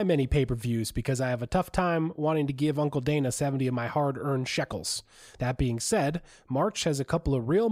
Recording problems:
abrupt cut into speech; at the start and the end

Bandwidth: 15.5 kHz